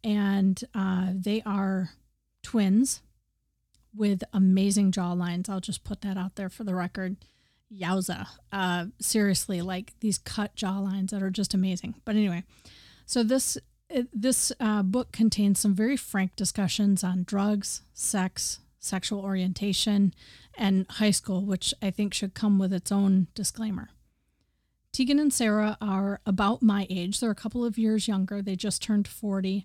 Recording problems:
none

